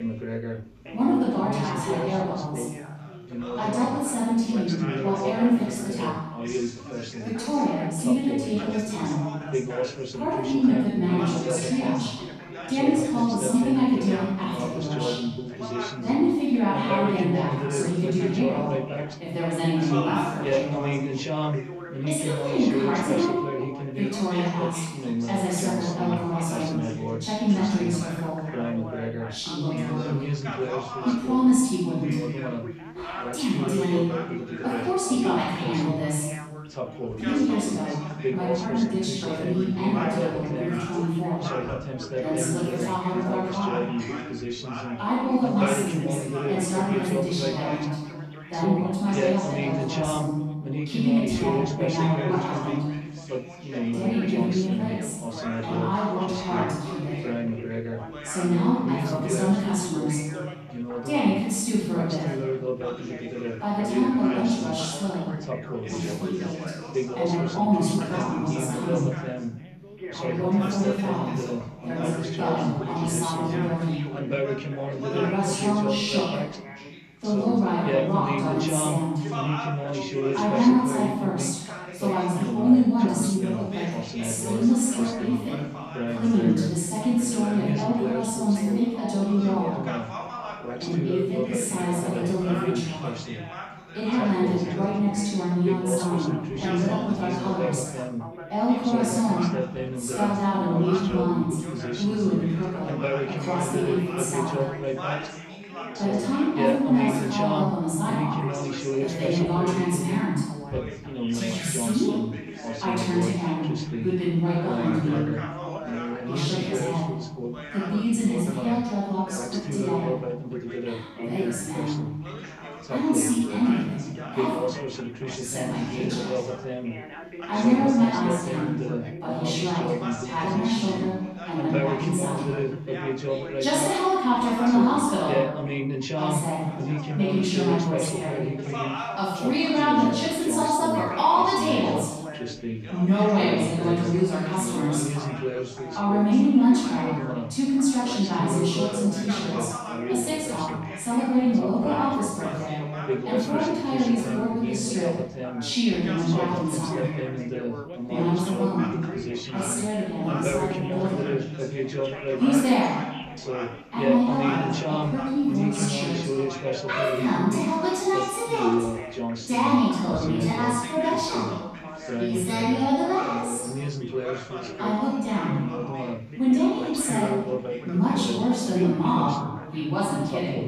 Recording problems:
room echo; strong; dies away in 1.1 s
off-mic speech; far
background chatter; loud; throughout; 4 voices, 6 dB below the speech

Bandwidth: 14.5 kHz